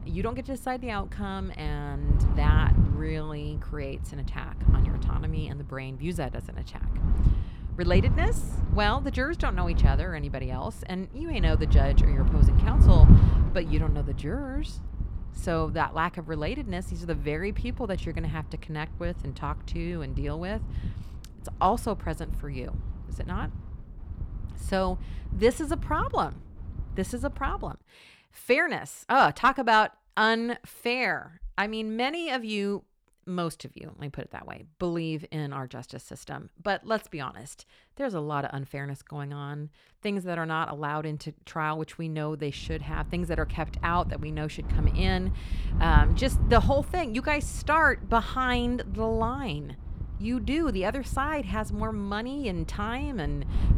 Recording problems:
wind noise on the microphone; occasional gusts; until 28 s and from 43 s on; 15 dB below the speech

